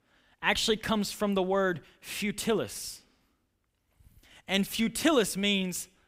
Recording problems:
none

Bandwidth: 15.5 kHz